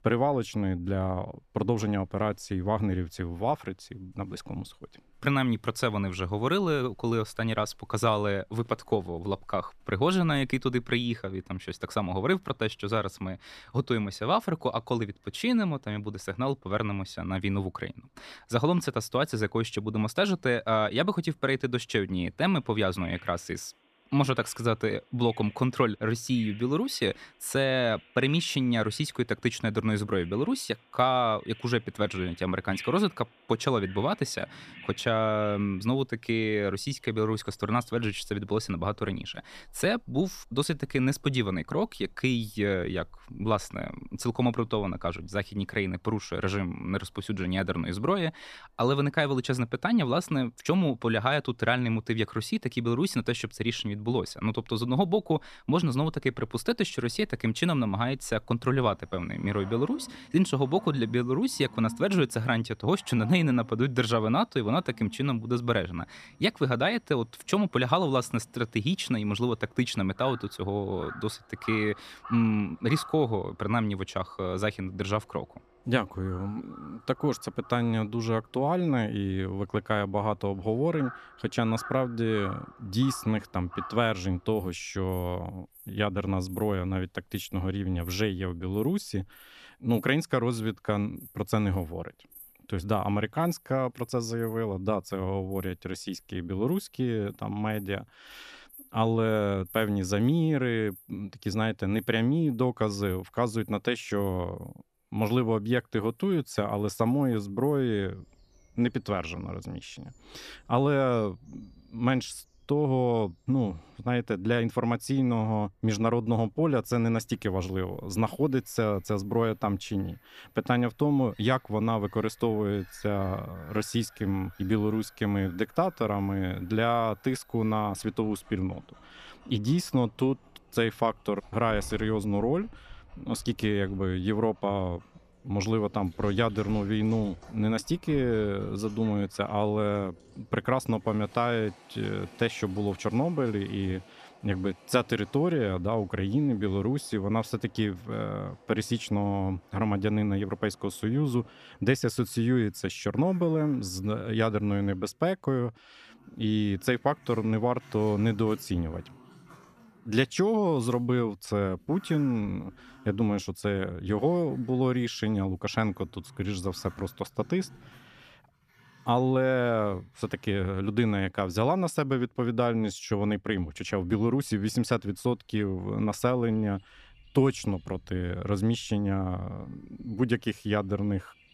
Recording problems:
animal sounds; faint; throughout; 20 dB below the speech

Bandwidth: 14.5 kHz